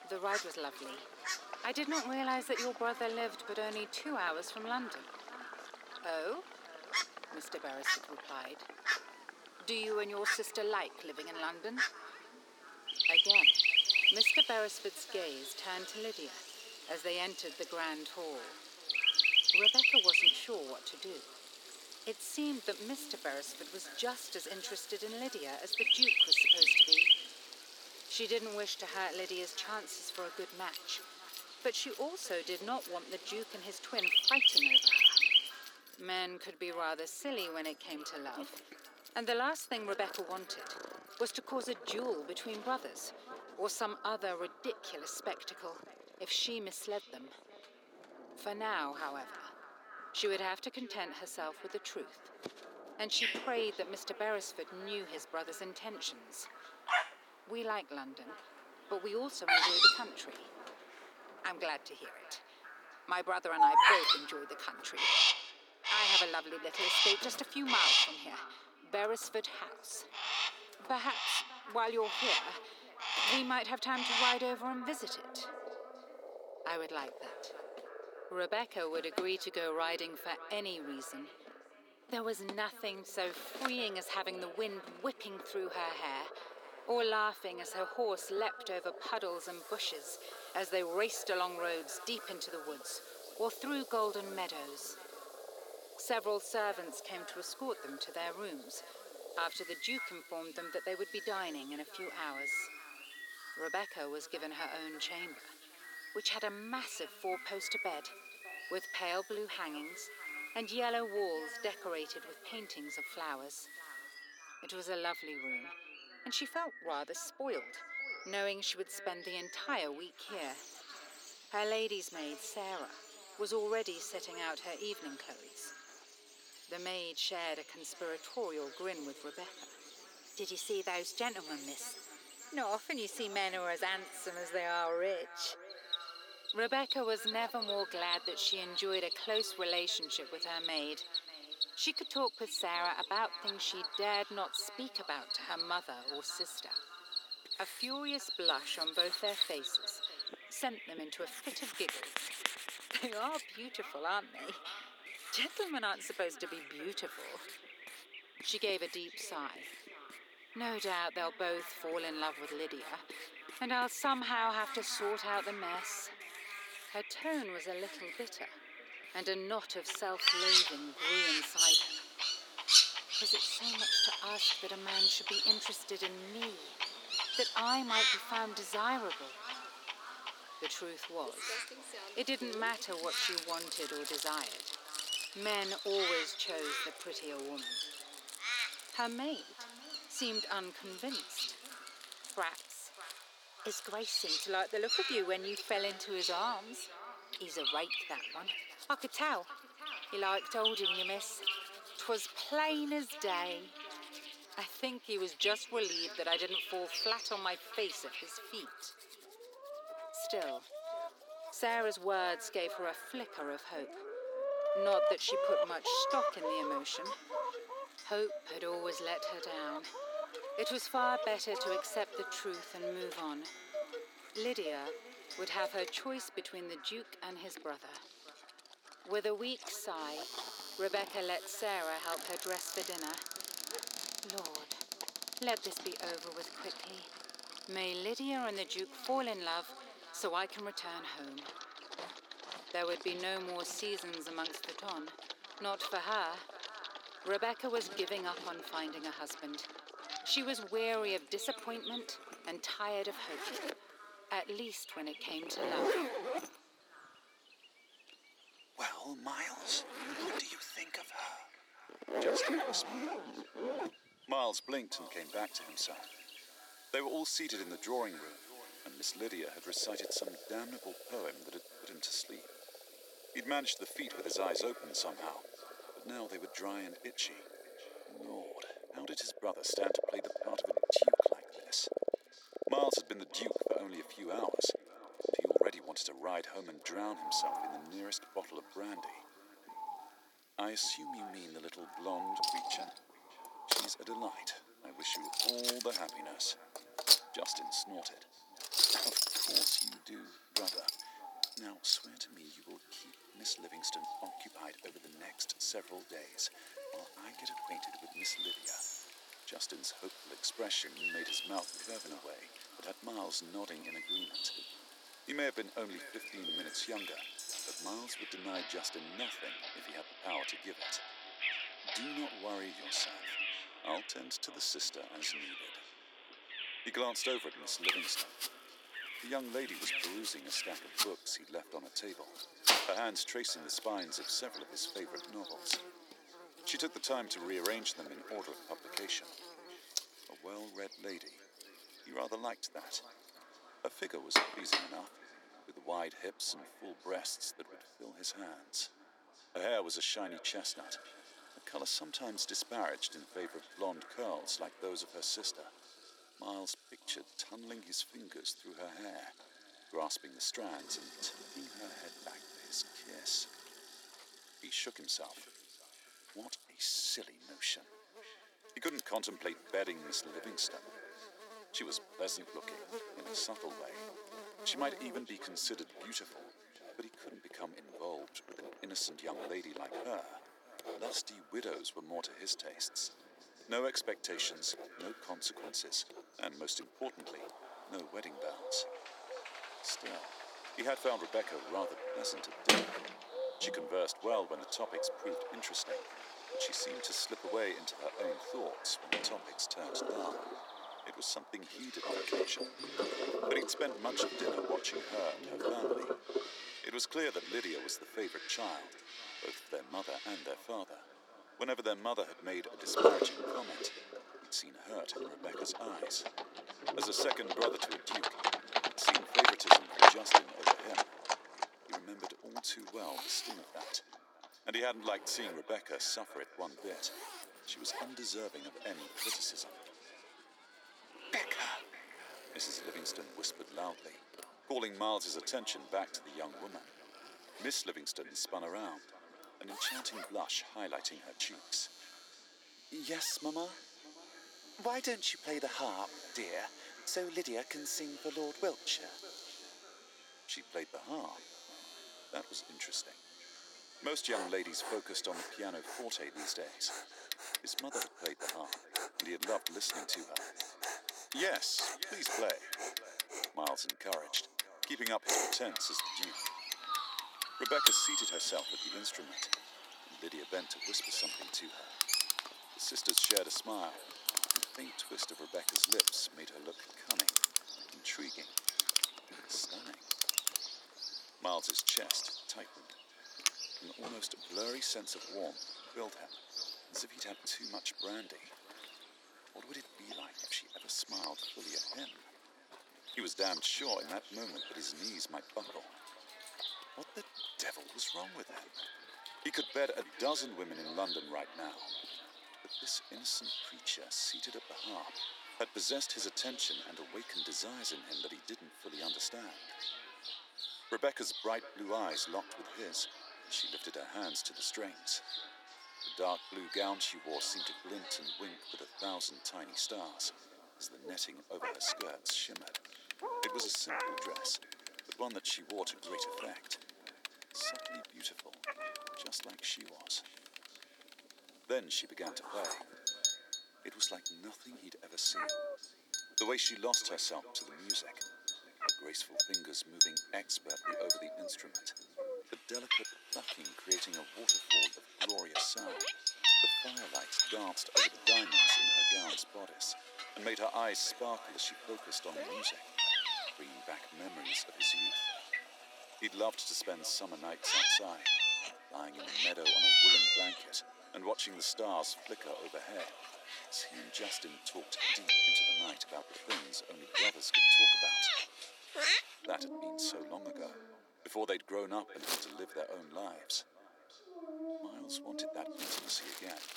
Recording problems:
echo of what is said; noticeable; throughout; 600 ms later, 15 dB below the speech
thin; somewhat; fading below 350 Hz
animal sounds; very loud; throughout; 6 dB above the speech
household noises; loud; throughout; 1 dB below the speech

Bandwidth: 18 kHz